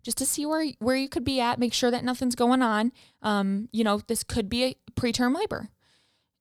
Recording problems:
none

